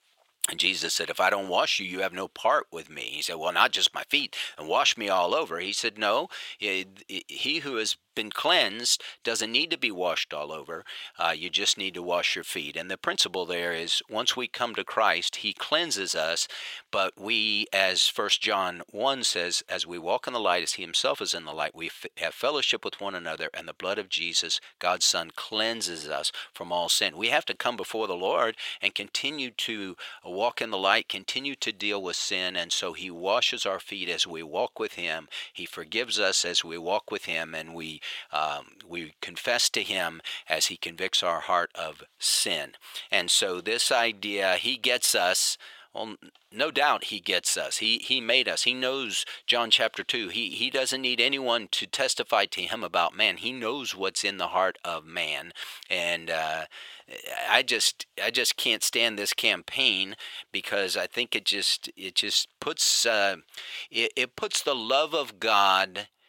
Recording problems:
thin; very; fading below 750 Hz

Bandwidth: 16.5 kHz